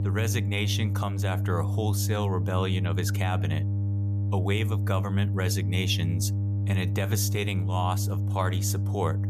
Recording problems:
electrical hum; loud; throughout; 50 Hz, 9 dB below the speech

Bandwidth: 14.5 kHz